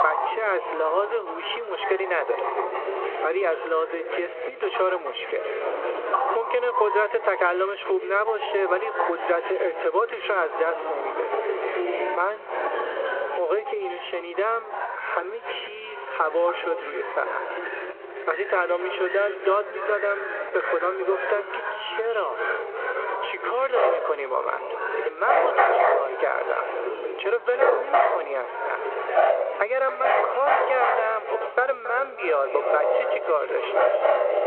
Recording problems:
echo of what is said; strong; from 15 s on; 280 ms later, 10 dB below the speech
phone-call audio
squashed, flat; somewhat, background pumping
animal sounds; loud; throughout; 1 dB below the speech
background chatter; loud; throughout; 4 voices, 7 dB below the speech

